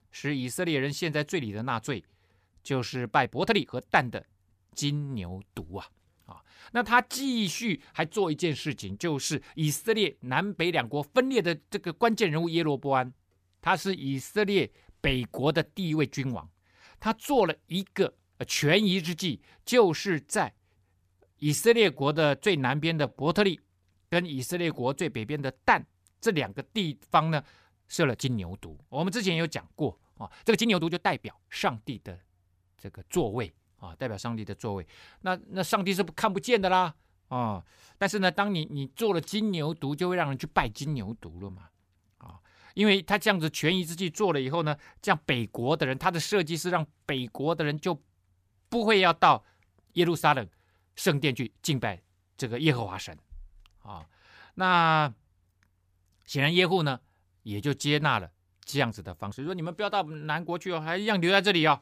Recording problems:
uneven, jittery; strongly; from 2.5 s to 1:00

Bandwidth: 15 kHz